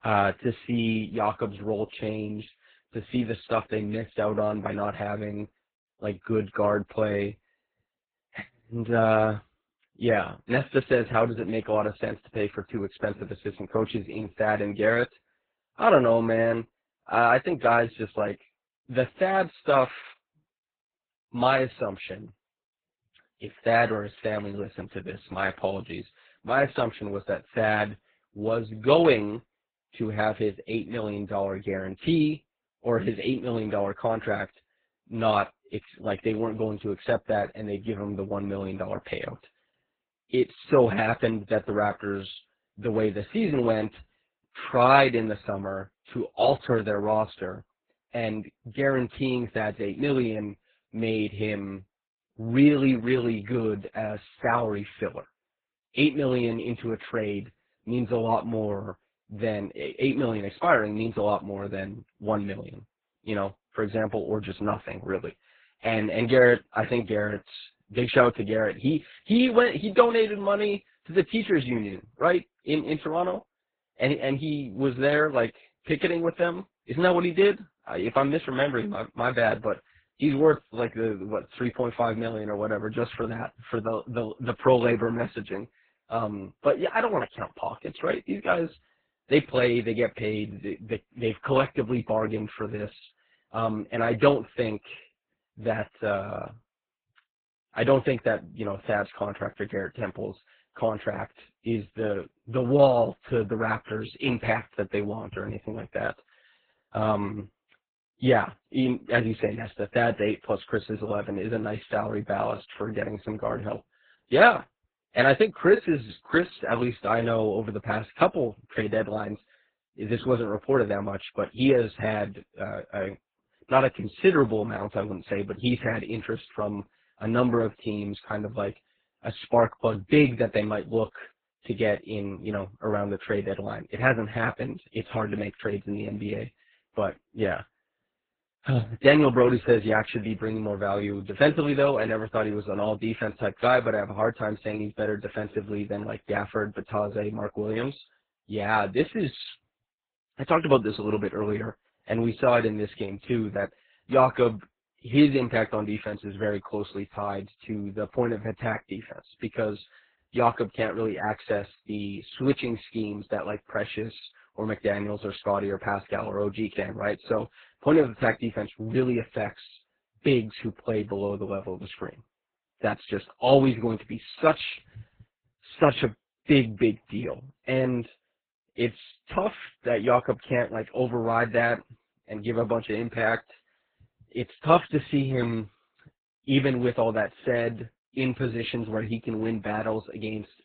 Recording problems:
garbled, watery; badly
high frequencies cut off; severe; nothing above 4 kHz

